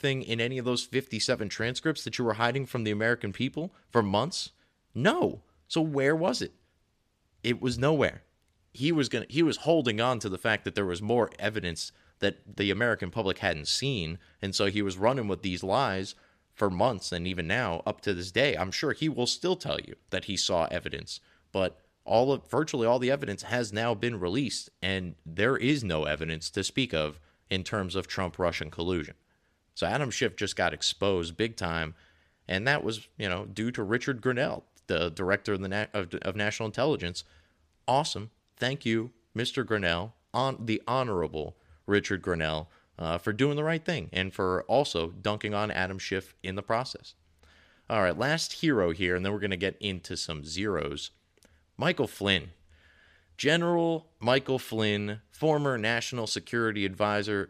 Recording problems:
none

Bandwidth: 14.5 kHz